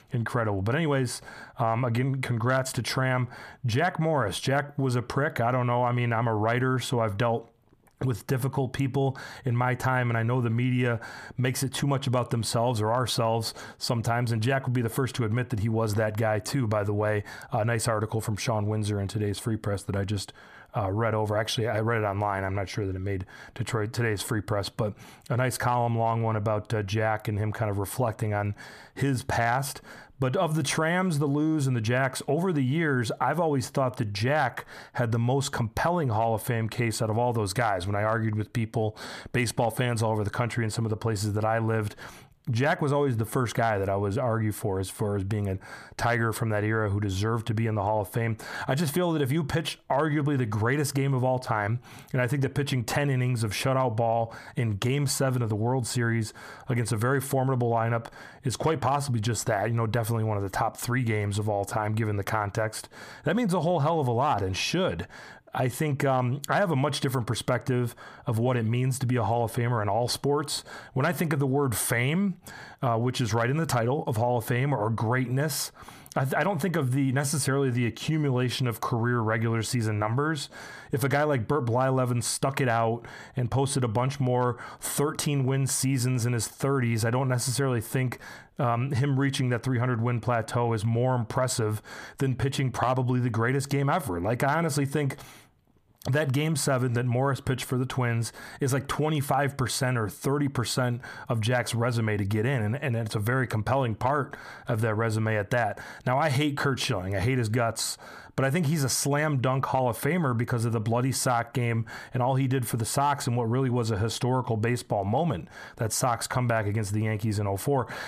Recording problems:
squashed, flat; heavily

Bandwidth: 14.5 kHz